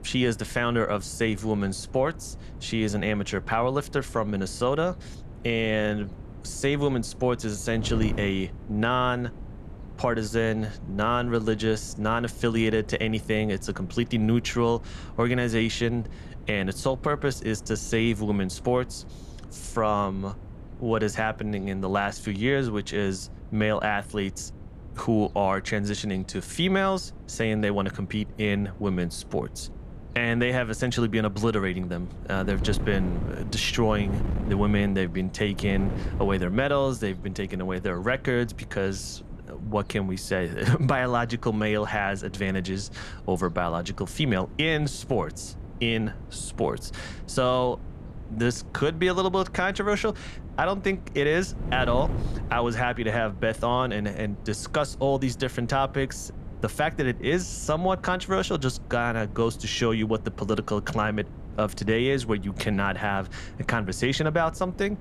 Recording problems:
wind noise on the microphone; occasional gusts; 20 dB below the speech

